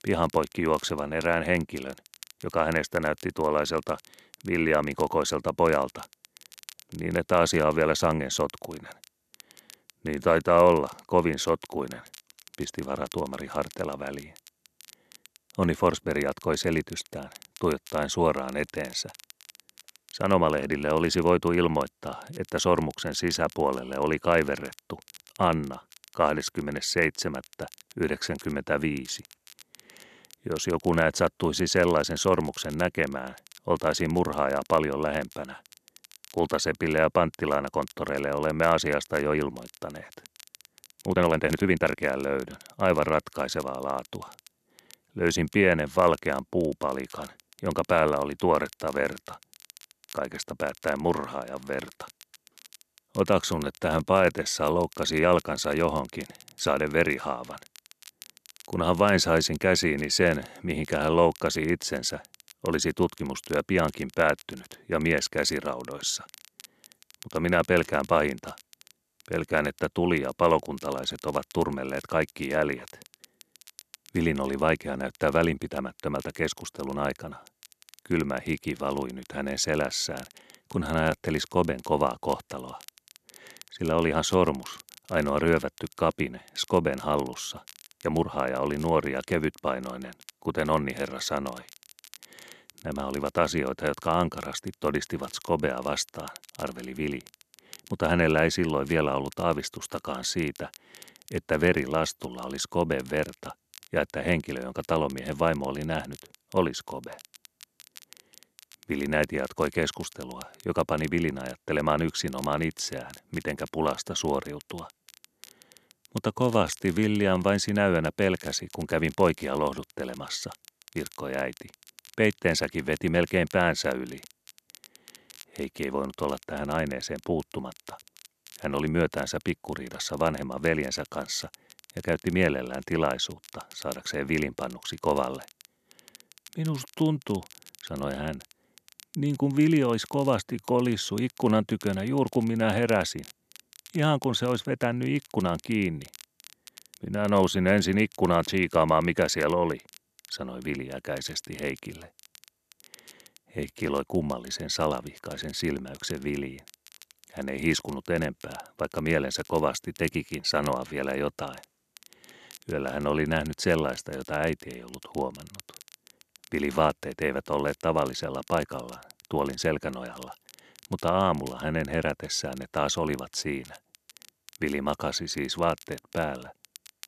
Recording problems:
crackle, like an old record; faint; 25 dB below the speech
uneven, jittery; strongly; from 41 s to 2:34

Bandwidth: 13.5 kHz